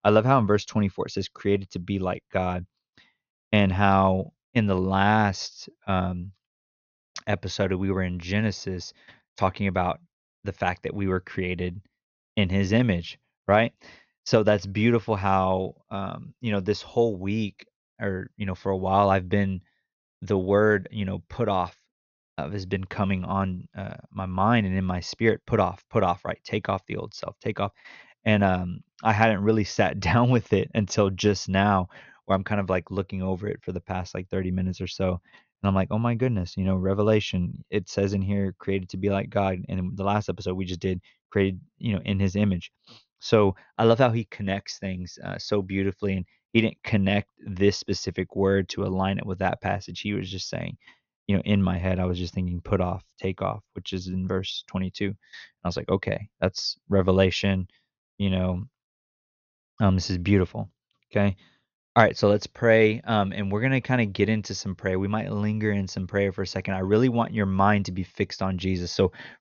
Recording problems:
high frequencies cut off; noticeable; nothing above 6.5 kHz

